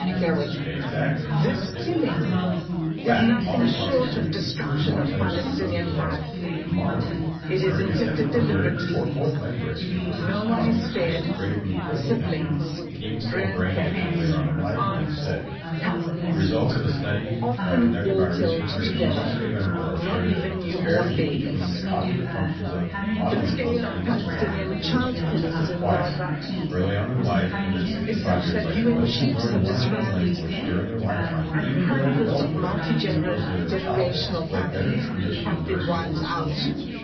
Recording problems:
off-mic speech; far
room echo; noticeable; dies away in 0.5 s
garbled, watery; slightly; nothing above 5 kHz
high frequencies cut off; slight
chatter from many people; very loud; throughout; 2 dB above the speech
electrical hum; faint; throughout; 60 Hz, 25 dB below the speech

